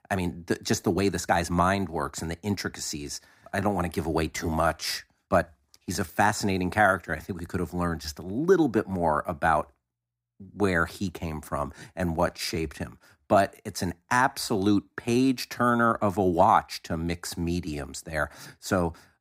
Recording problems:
uneven, jittery; strongly; from 1 to 18 s

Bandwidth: 15.5 kHz